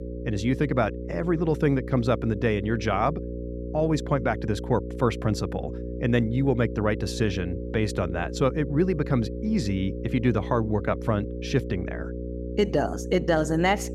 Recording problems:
electrical hum; noticeable; throughout; 60 Hz, 10 dB below the speech

